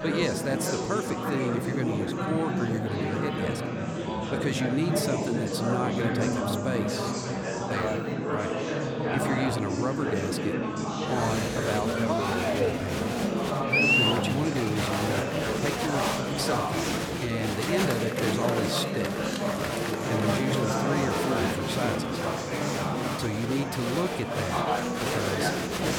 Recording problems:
chatter from many people; very loud; throughout; 4 dB above the speech

